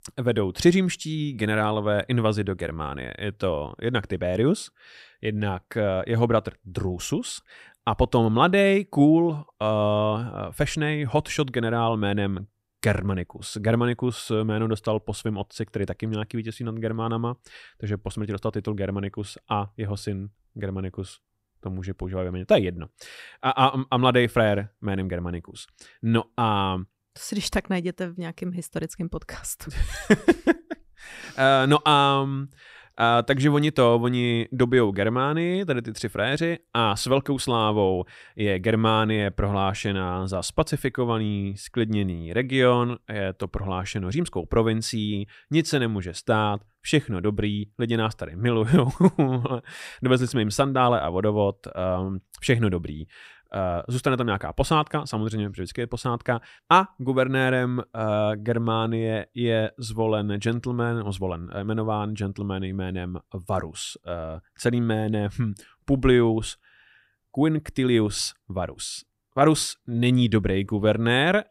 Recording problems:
none

